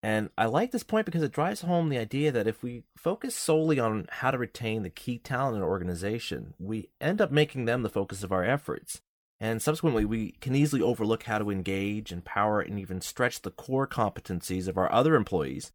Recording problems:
none

